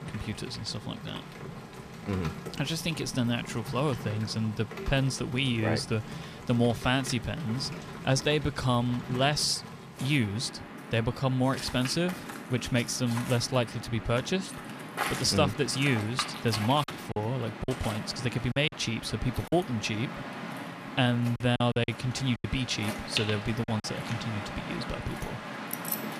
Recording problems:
rain or running water; loud; throughout; 9 dB below the speech
choppy; very; from 17 to 20 s and from 21 to 24 s; 9% of the speech affected
jangling keys; noticeable; at 26 s; peak 4 dB below the speech

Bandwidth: 14.5 kHz